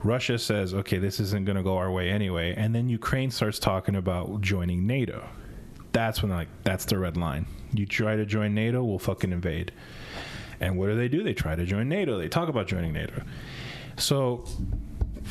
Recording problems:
squashed, flat; somewhat

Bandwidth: 13.5 kHz